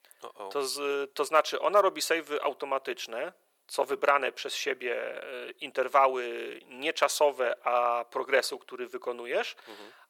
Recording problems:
thin; very; fading below 400 Hz

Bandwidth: 18.5 kHz